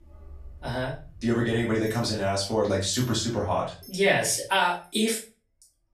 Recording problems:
off-mic speech; far
room echo; slight; dies away in 0.3 s
household noises; faint; throughout; 25 dB below the speech

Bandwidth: 14.5 kHz